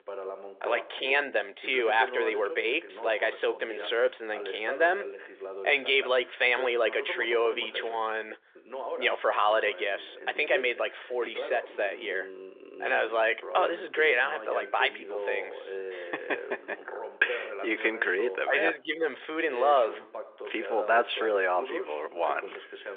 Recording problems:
thin; very; fading below 400 Hz
phone-call audio; nothing above 3 kHz
voice in the background; noticeable; throughout; 10 dB below the speech

